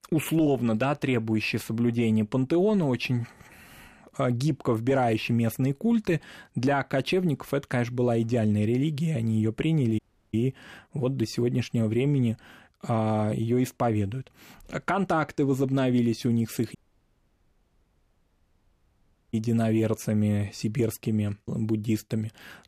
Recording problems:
audio cutting out; at 10 s and at 17 s for 2.5 s

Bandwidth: 14.5 kHz